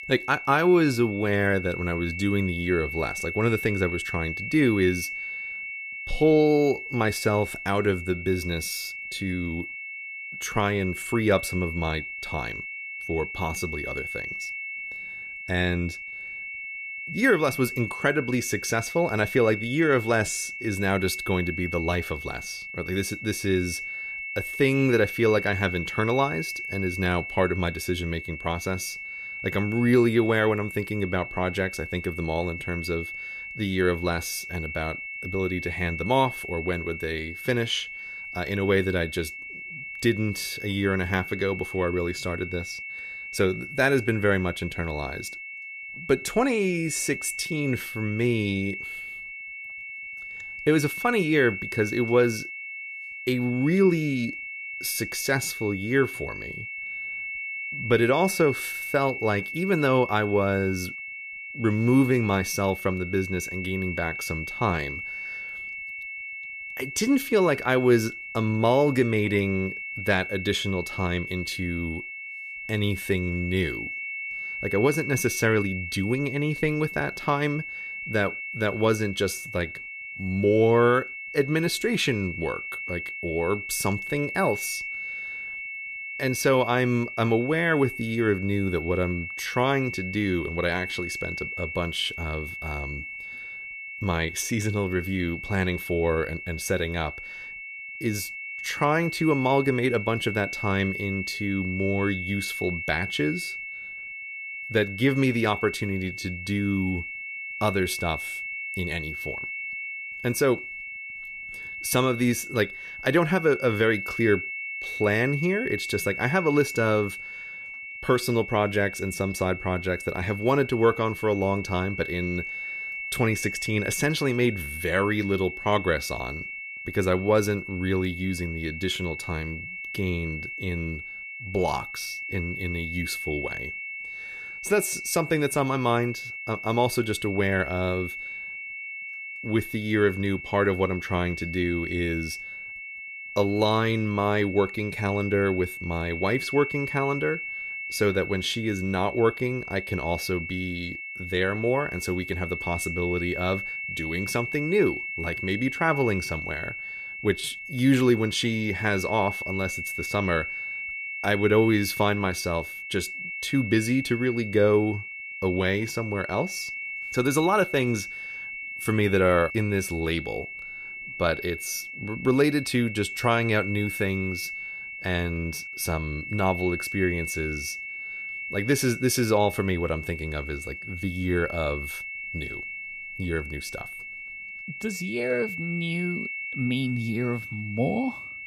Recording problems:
high-pitched whine; loud; throughout; 2 kHz, 7 dB below the speech

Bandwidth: 14.5 kHz